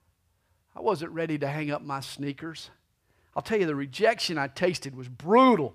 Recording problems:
none

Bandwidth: 15 kHz